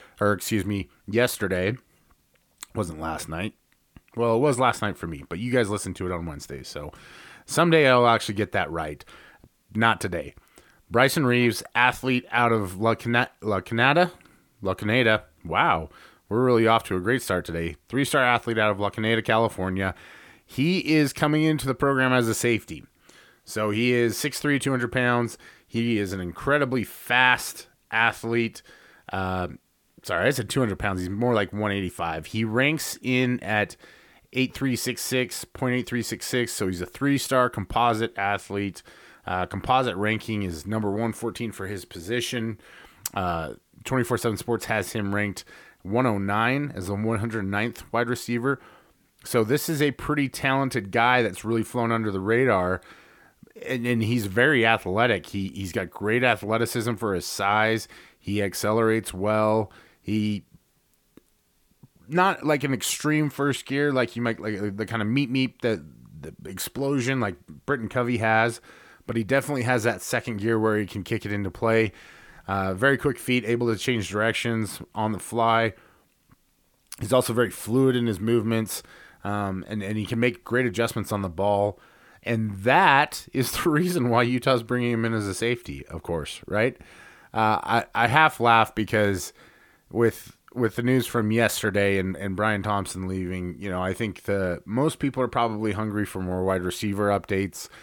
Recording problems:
none

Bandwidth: 18 kHz